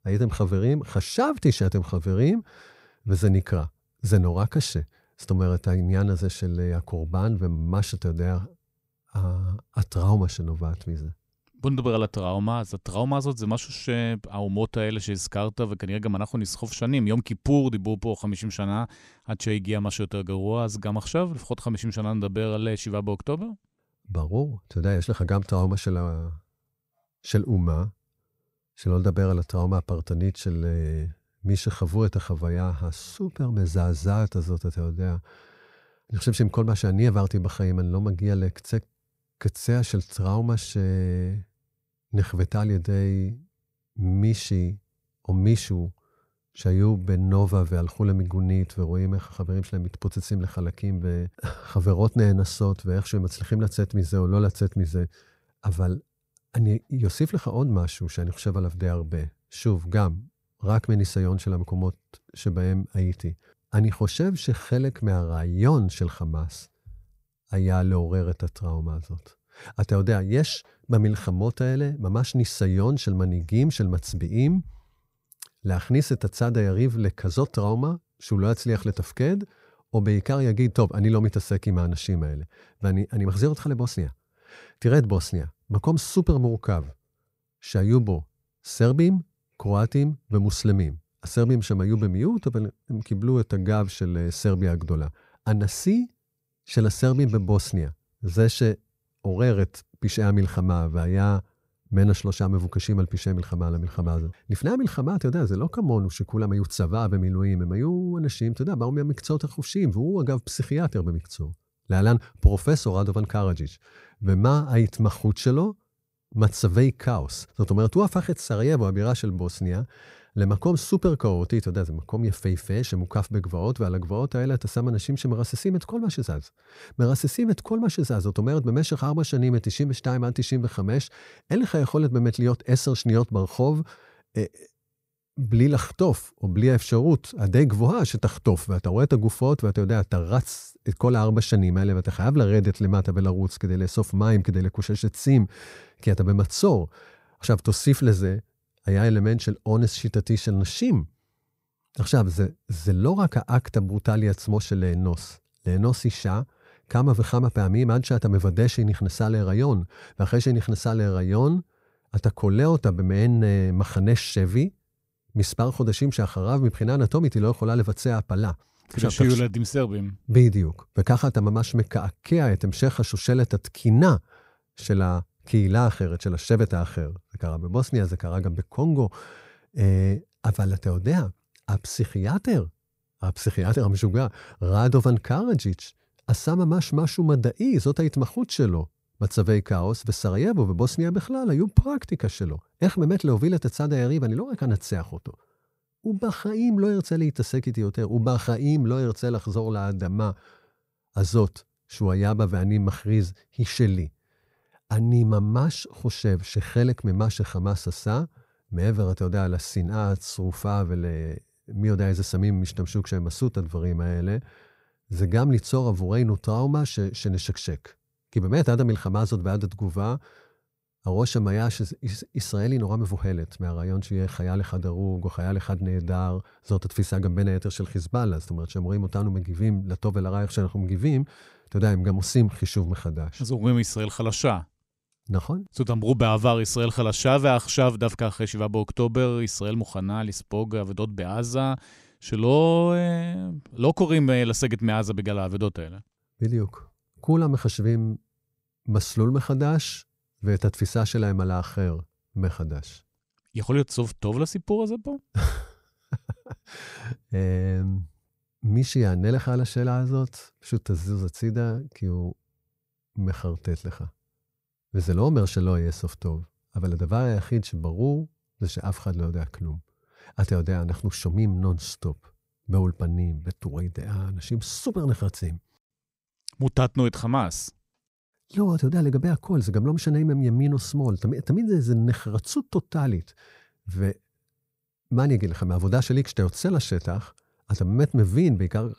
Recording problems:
none

